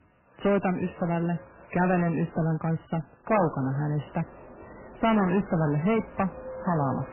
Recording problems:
garbled, watery; badly; nothing above 3 kHz
distortion; slight; 10 dB below the speech
train or aircraft noise; noticeable; throughout; 20 dB below the speech

